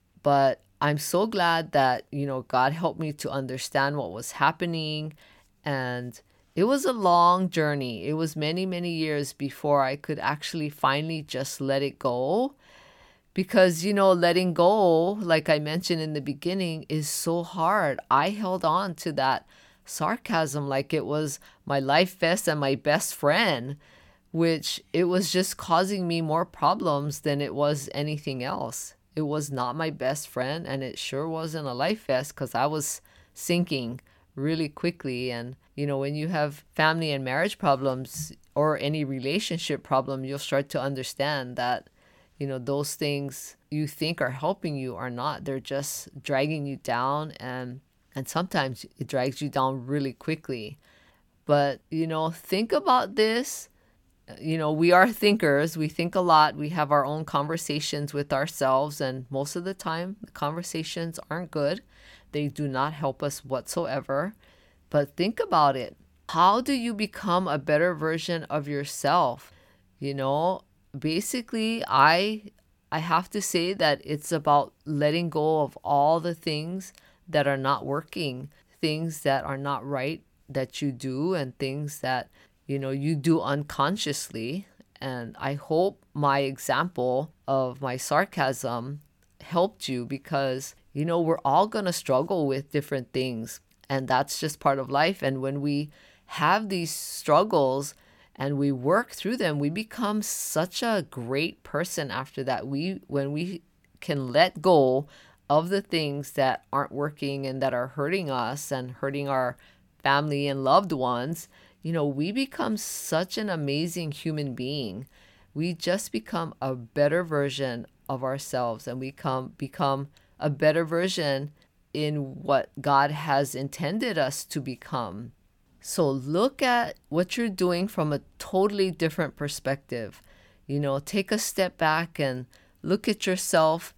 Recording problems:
none

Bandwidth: 17 kHz